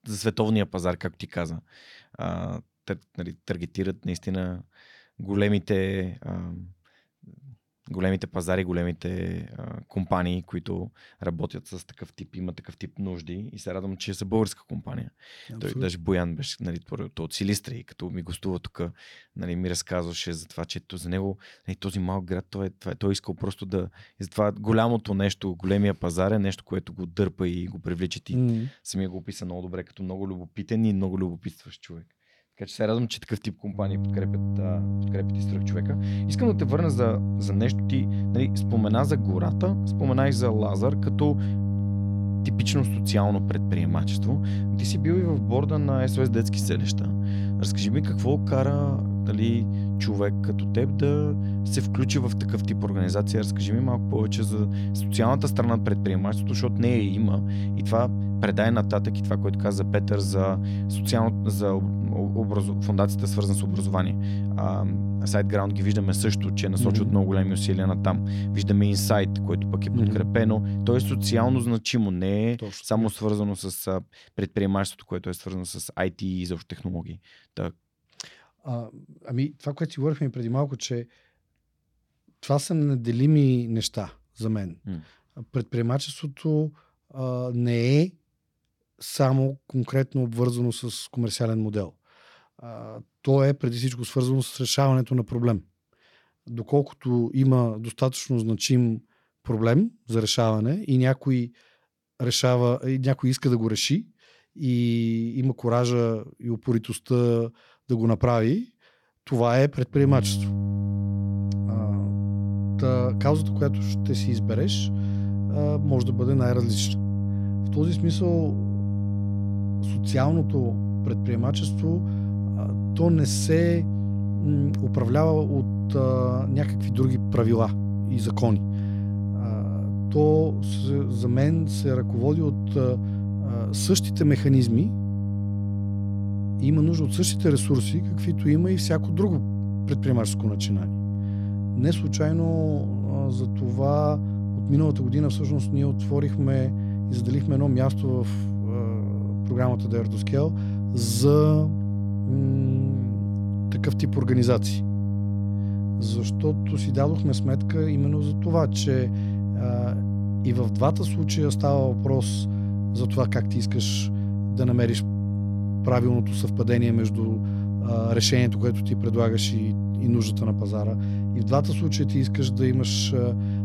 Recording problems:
electrical hum; loud; from 34 s to 1:12 and from 1:50 on; 50 Hz, 7 dB below the speech

